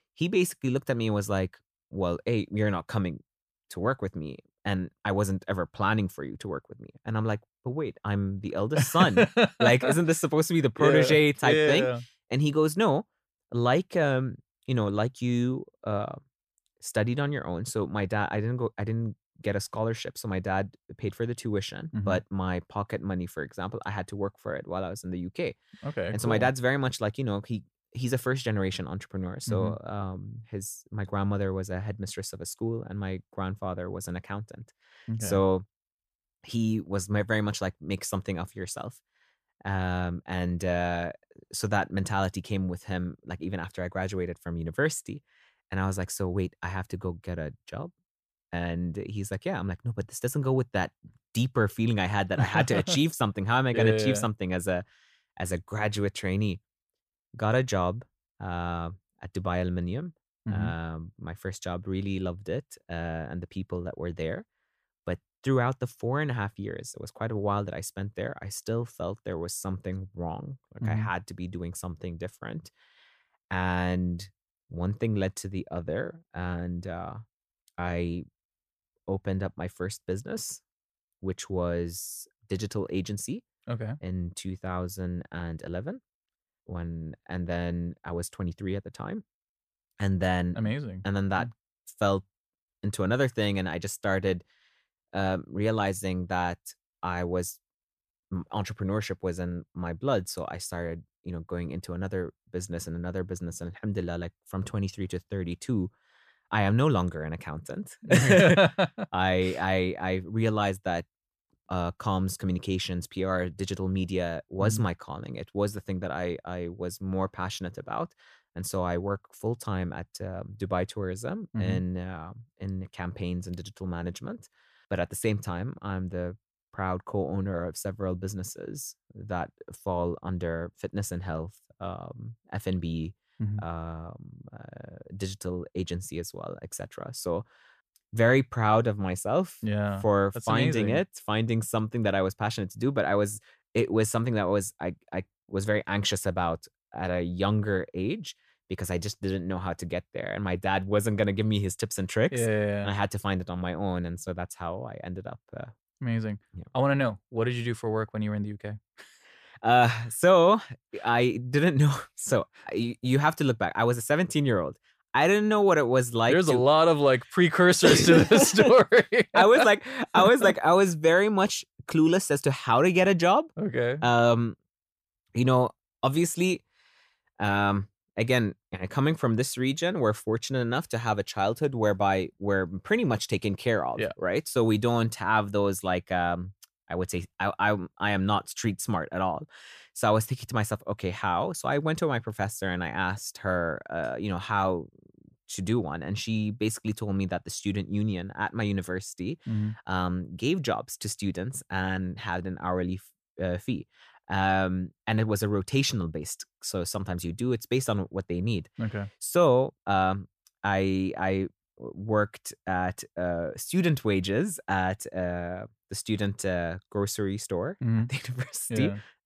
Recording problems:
none

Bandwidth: 14.5 kHz